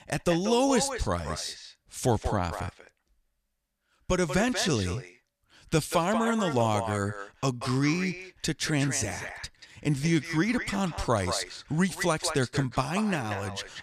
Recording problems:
echo of what is said; strong; throughout; 190 ms later, 9 dB below the speech

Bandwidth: 14.5 kHz